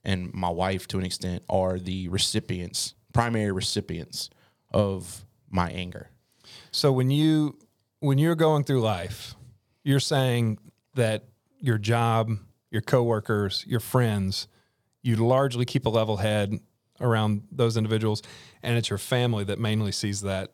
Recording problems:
none

